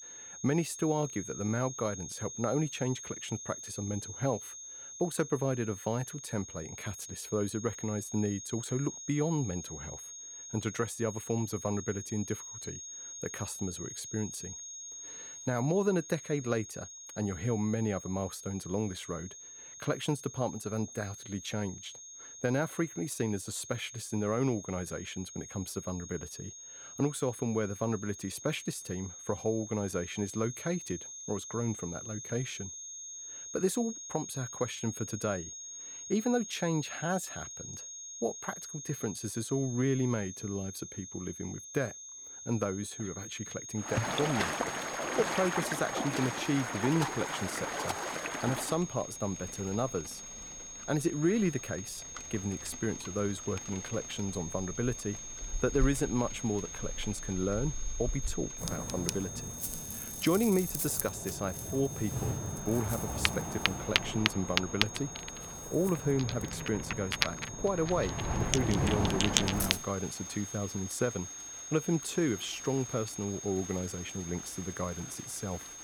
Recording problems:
high-pitched whine; loud; throughout; 6.5 kHz, 8 dB below the speech
rain or running water; loud; from 44 s on; as loud as the speech

